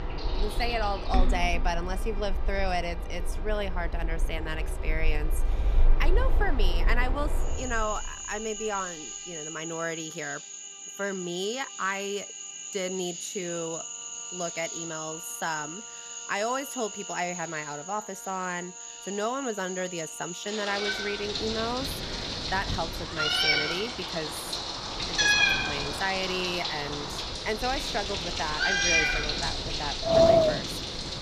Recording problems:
animal sounds; very loud; throughout; 2 dB above the speech
wind in the background; very loud; from 21 s on; 2 dB above the speech
background music; faint; throughout; 20 dB below the speech

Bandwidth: 14.5 kHz